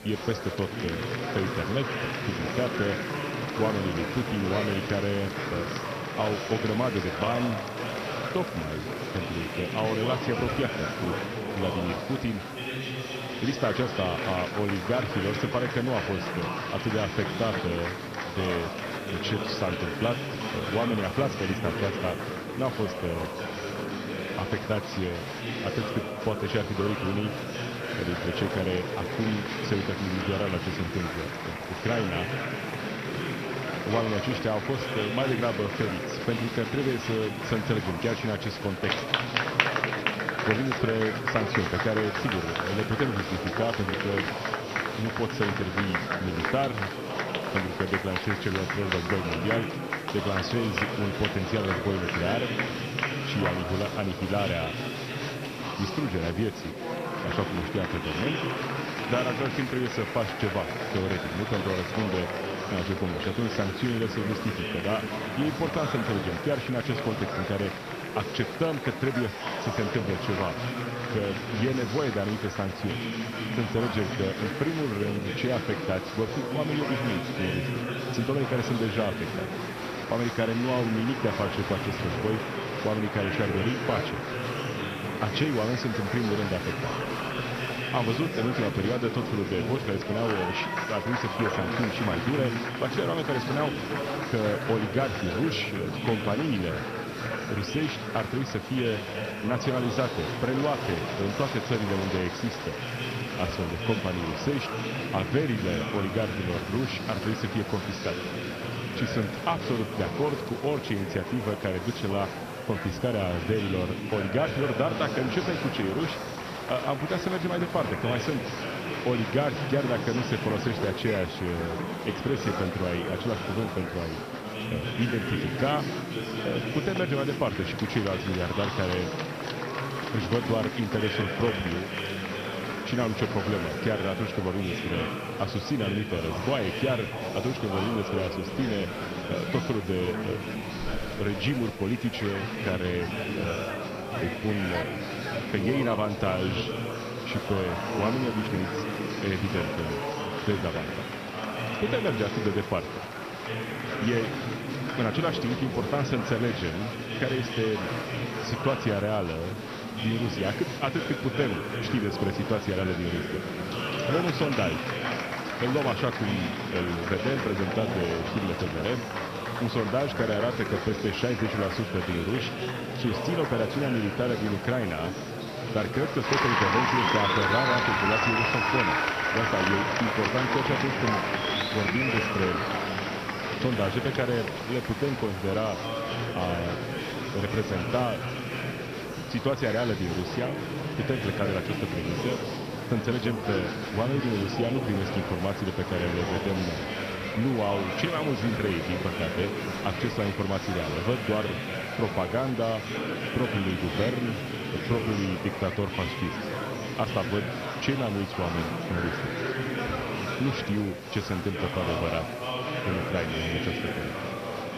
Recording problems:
garbled, watery; slightly; nothing above 6 kHz
murmuring crowd; loud; throughout; 1 dB below the speech
hiss; faint; throughout; 20 dB below the speech

